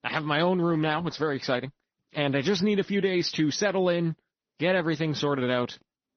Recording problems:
high frequencies cut off; noticeable; nothing above 6 kHz
garbled, watery; slightly

